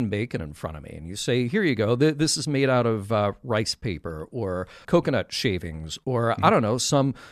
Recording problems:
abrupt cut into speech; at the start

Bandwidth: 13.5 kHz